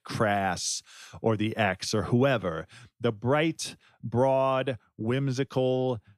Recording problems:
none

